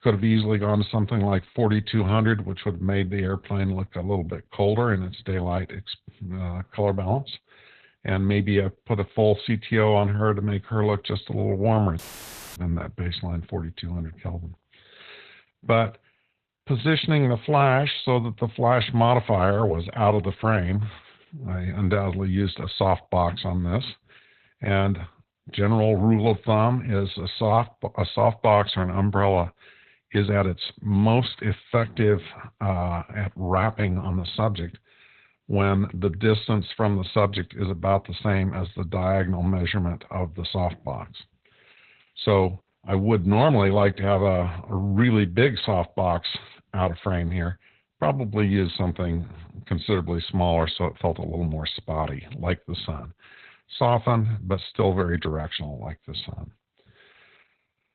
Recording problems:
garbled, watery; badly; nothing above 4 kHz
audio cutting out; filled with static; at 12 s for 0.5 s

